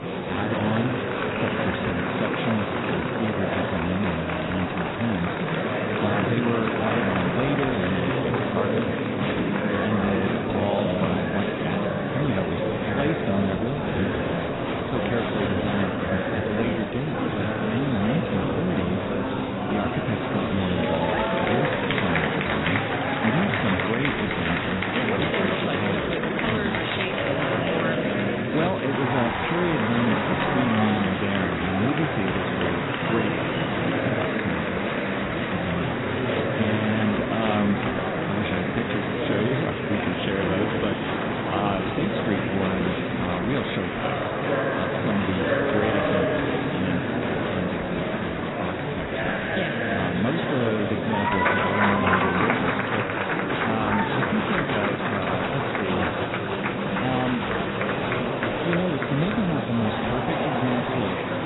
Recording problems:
garbled, watery; badly; nothing above 4 kHz
murmuring crowd; very loud; throughout; 3 dB above the speech

